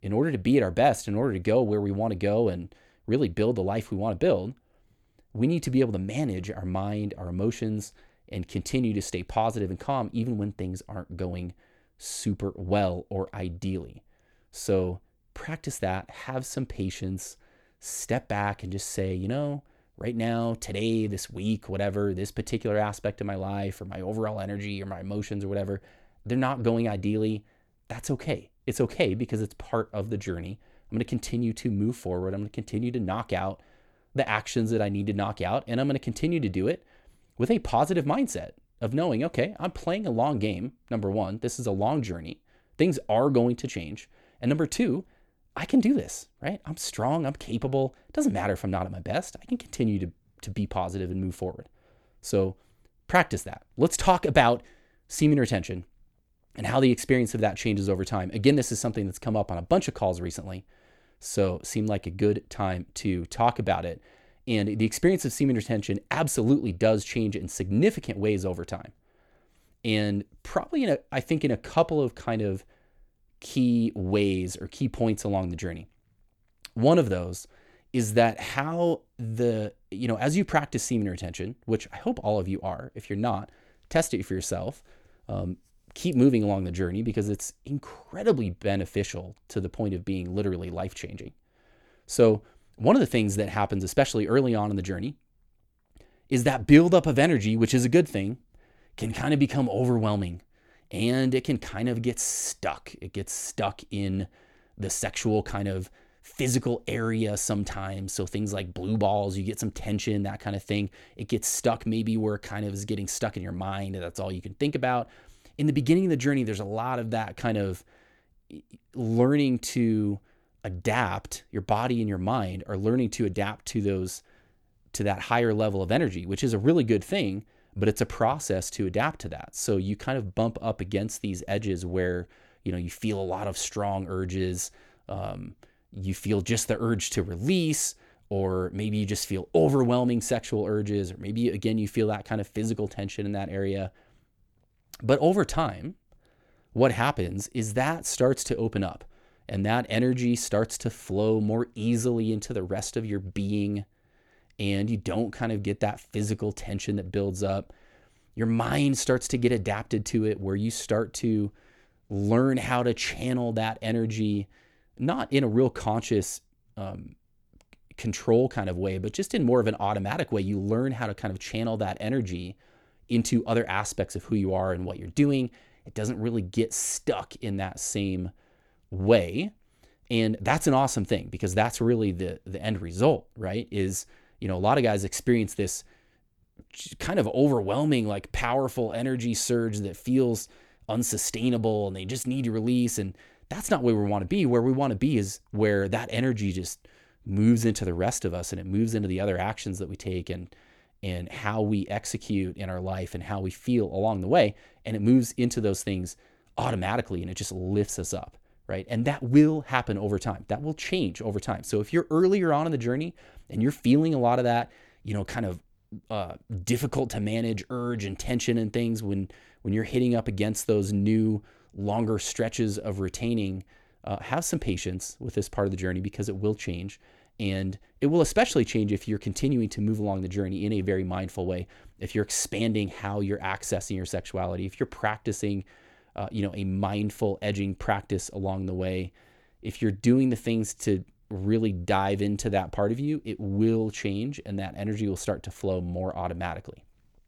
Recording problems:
none

